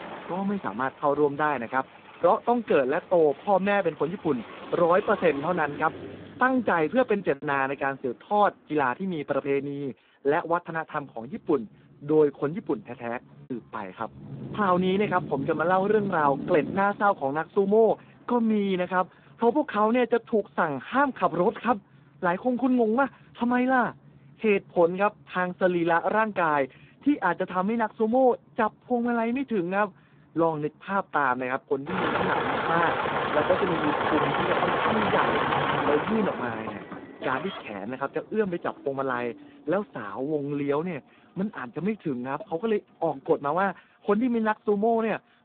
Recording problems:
phone-call audio; poor line; nothing above 3.5 kHz
traffic noise; loud; throughout; 4 dB below the speech
choppy; occasionally; at 7 s and from 9.5 to 14 s; 3% of the speech affected

